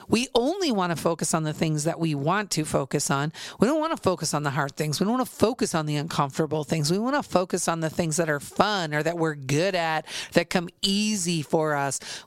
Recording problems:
squashed, flat; somewhat

